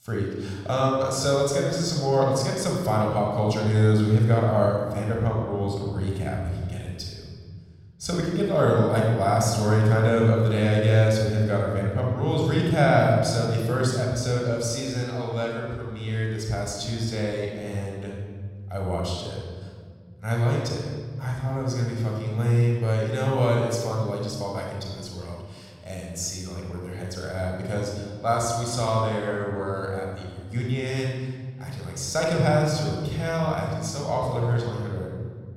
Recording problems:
room echo; noticeable; dies away in 1.8 s
off-mic speech; somewhat distant

